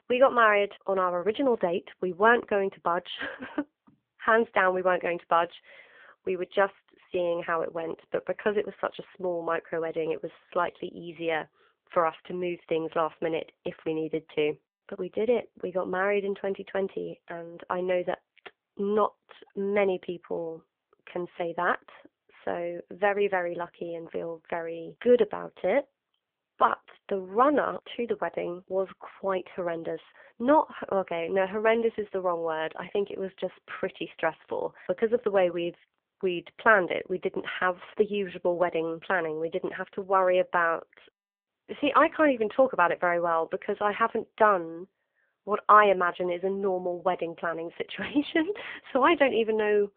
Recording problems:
phone-call audio; poor line

